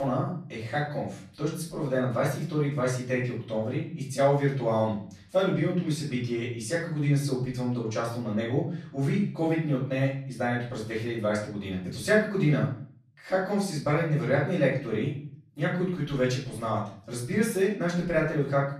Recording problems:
off-mic speech; far
room echo; noticeable; dies away in 0.5 s
abrupt cut into speech; at the start

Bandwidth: 13.5 kHz